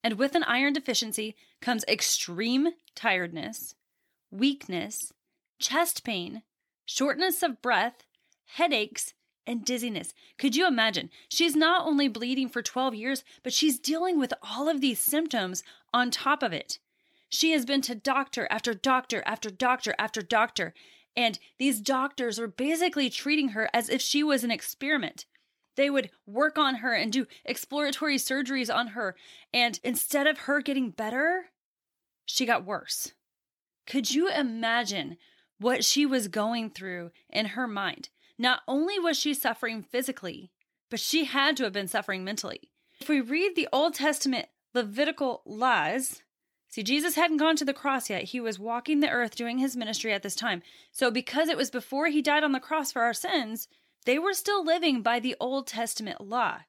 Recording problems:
none

